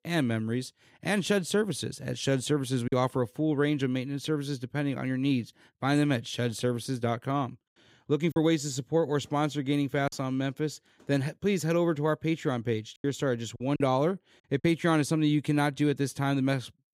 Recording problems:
choppy; occasionally; at 3 s, from 8.5 to 10 s and from 13 to 15 s; 4% of the speech affected

